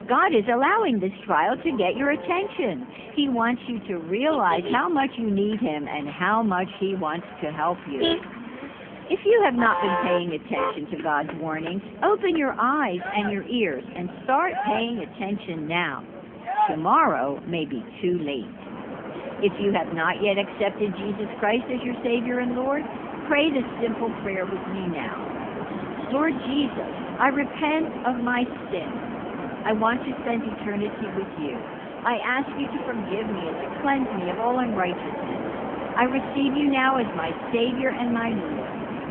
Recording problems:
phone-call audio; poor line; nothing above 3.5 kHz
traffic noise; loud; throughout; 8 dB below the speech

